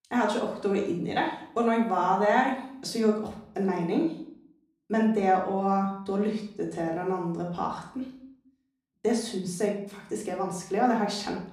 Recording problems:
off-mic speech; far
room echo; noticeable; dies away in 0.5 s

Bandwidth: 14.5 kHz